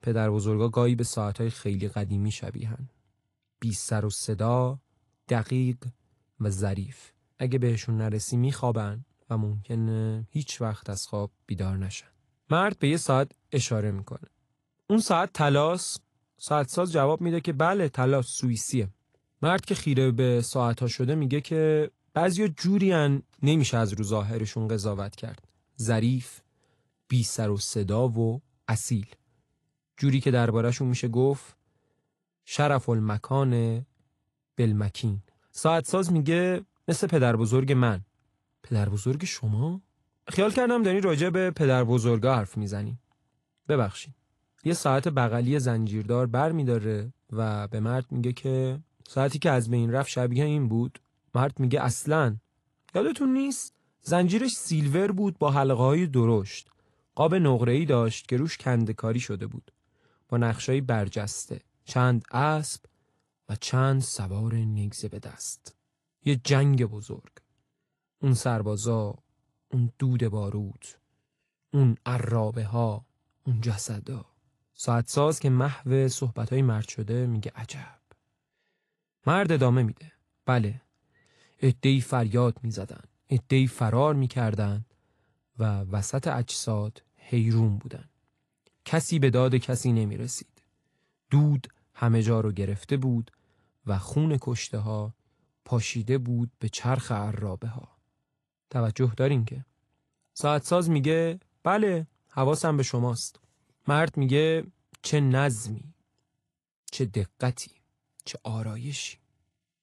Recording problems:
garbled, watery; slightly; nothing above 11 kHz

